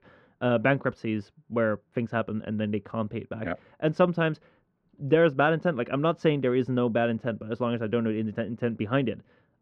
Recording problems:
muffled; very; fading above 2 kHz

